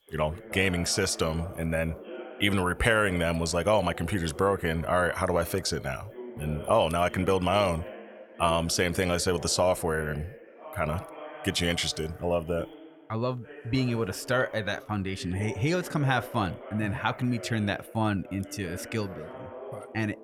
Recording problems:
voice in the background; noticeable; throughout; 15 dB below the speech

